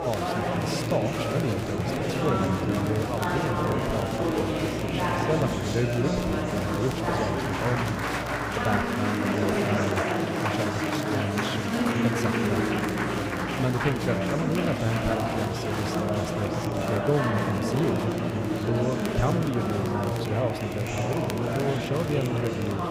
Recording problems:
chatter from many people; very loud; throughout; 3 dB above the speech
electrical hum; noticeable; until 9 s and from 12 s on; 60 Hz, 15 dB below the speech
crackle, like an old record; noticeable; 15 dB below the speech

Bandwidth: 15.5 kHz